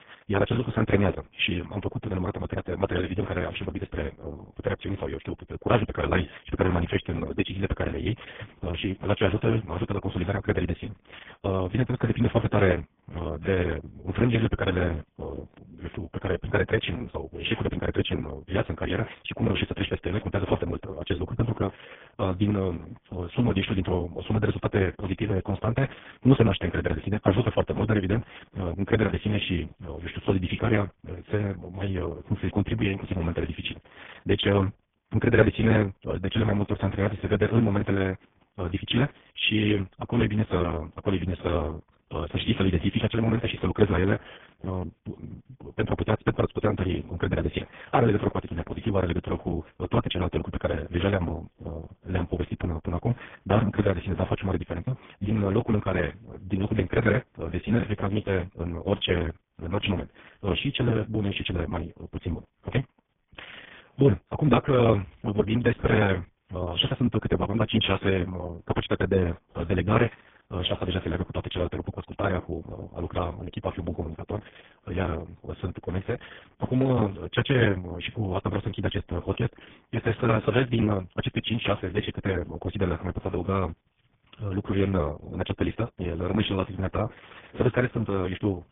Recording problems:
garbled, watery; badly
high frequencies cut off; severe; nothing above 3.5 kHz
wrong speed, natural pitch; too fast; 1.5 times normal speed

